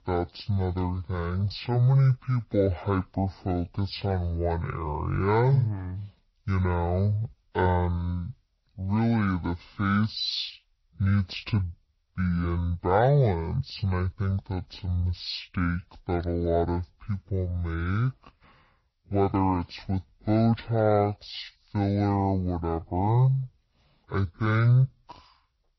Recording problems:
wrong speed and pitch; too slow and too low; 0.5 times normal speed
garbled, watery; slightly; nothing above 5 kHz

